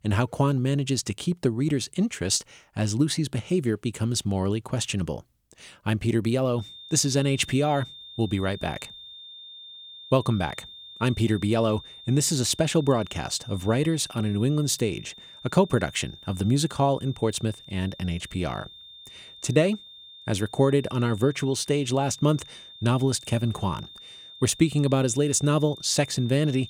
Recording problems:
high-pitched whine; noticeable; from 6.5 s on; 3.5 kHz, 15 dB below the speech

